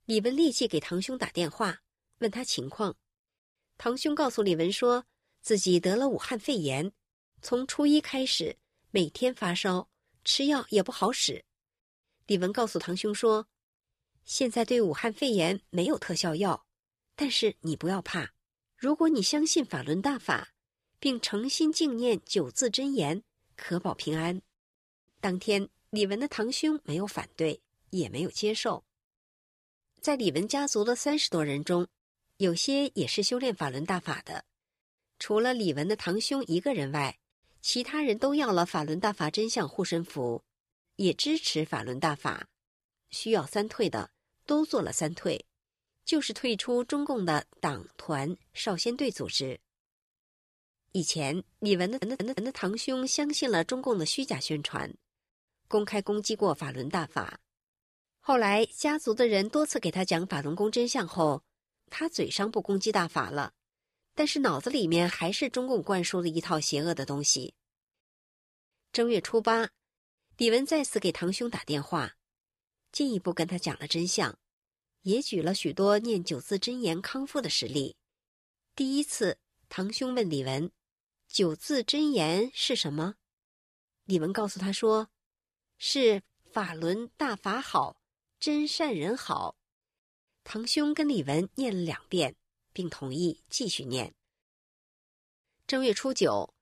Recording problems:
audio stuttering; at 52 s

